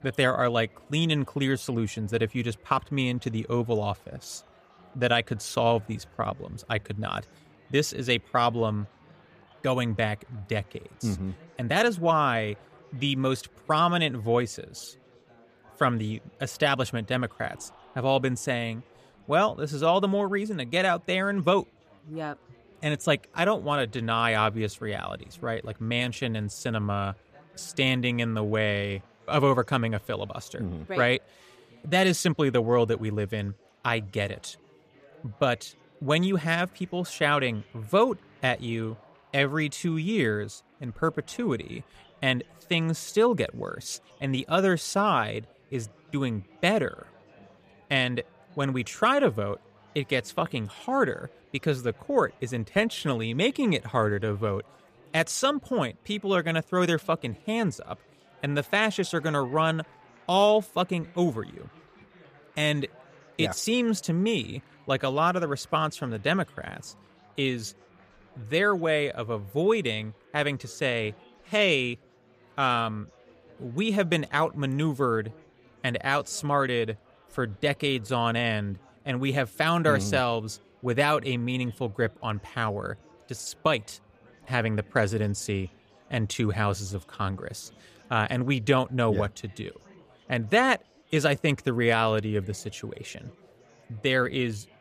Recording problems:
murmuring crowd; faint; throughout; 30 dB below the speech

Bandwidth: 14.5 kHz